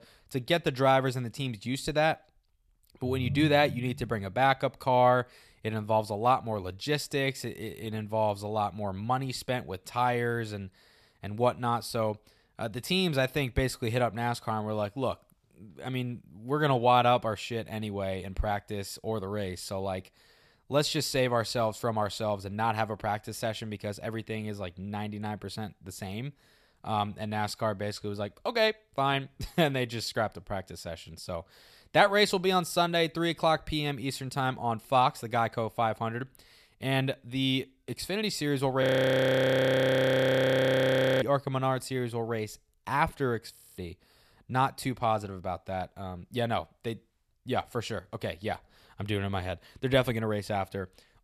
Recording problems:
phone ringing; noticeable; from 3 to 4 s; peak 4 dB below the speech
audio freezing; at 39 s for 2.5 s and at 44 s

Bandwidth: 14.5 kHz